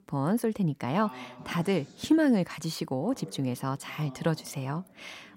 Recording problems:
voice in the background; faint; throughout; 20 dB below the speech

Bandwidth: 16 kHz